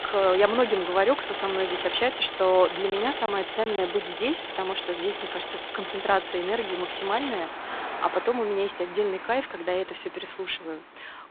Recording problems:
phone-call audio; poor line
traffic noise; loud; throughout; 6 dB below the speech
choppy; very; at 3 s; 6% of the speech affected

